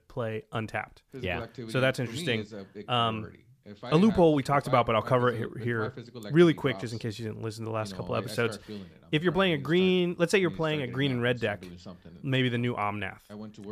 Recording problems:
voice in the background; noticeable; throughout; 15 dB below the speech

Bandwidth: 14.5 kHz